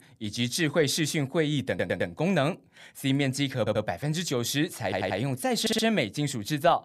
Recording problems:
audio stuttering; 4 times, first at 1.5 s

